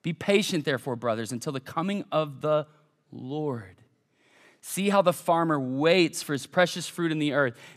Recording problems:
none

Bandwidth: 14.5 kHz